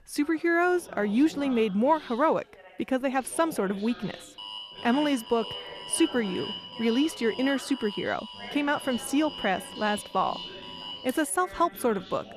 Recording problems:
background chatter; noticeable; throughout; 2 voices, 20 dB below the speech
alarm; noticeable; from 4.5 to 11 s; peak 8 dB below the speech

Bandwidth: 14 kHz